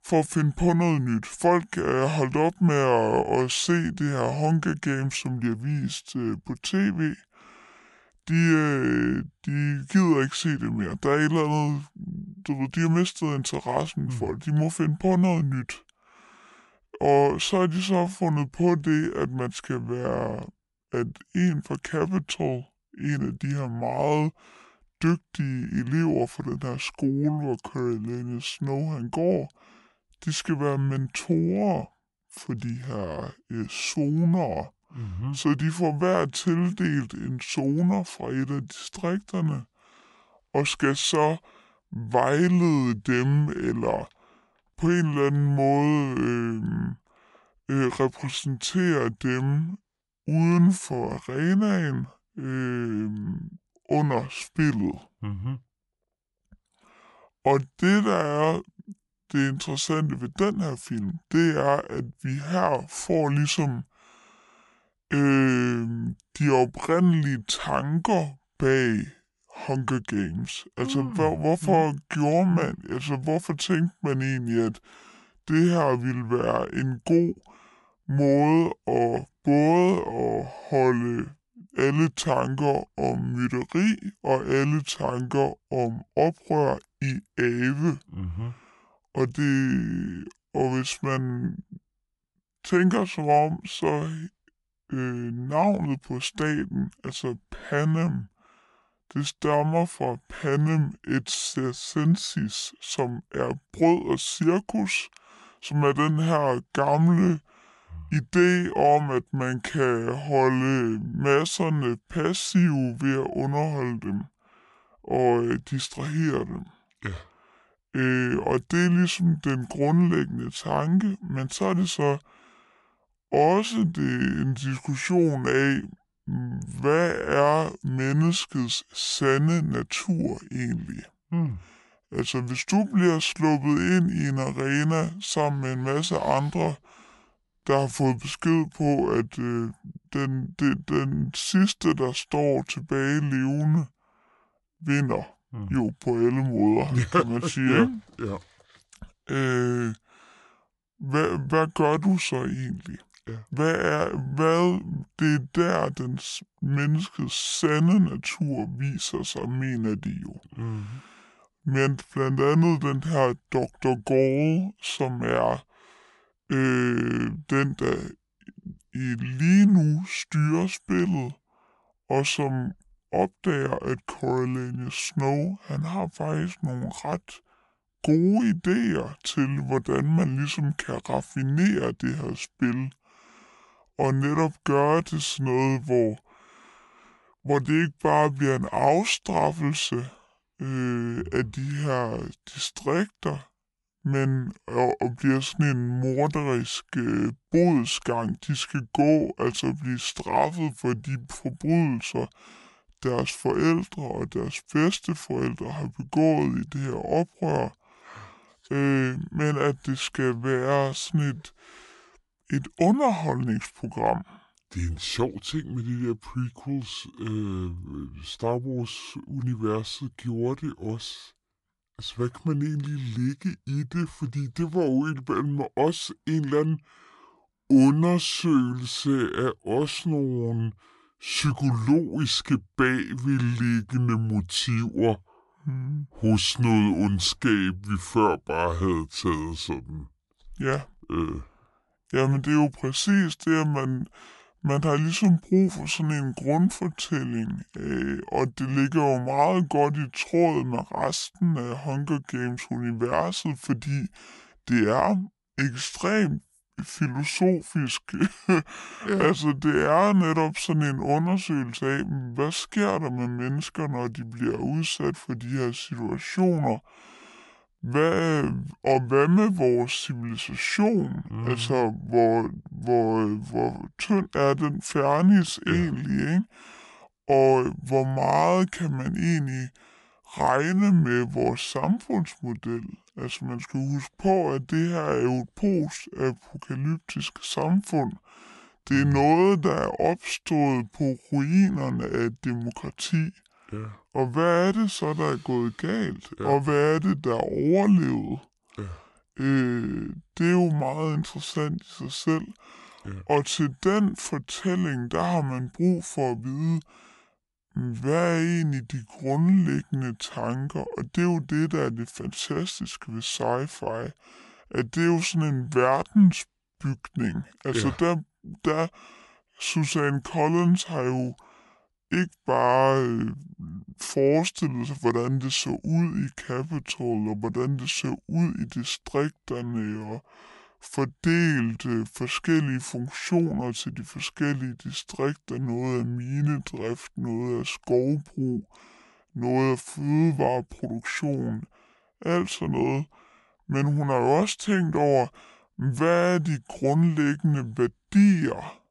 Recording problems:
wrong speed and pitch; too slow and too low; 0.7 times normal speed

